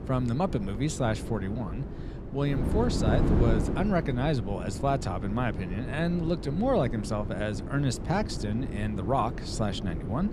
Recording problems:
wind noise on the microphone; heavy; 8 dB below the speech

